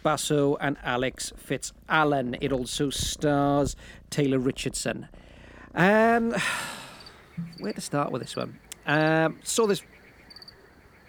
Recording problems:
animal sounds; faint; throughout; 20 dB below the speech

